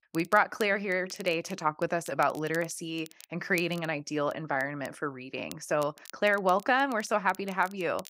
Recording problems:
crackle, like an old record; faint; 20 dB below the speech

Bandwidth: 15.5 kHz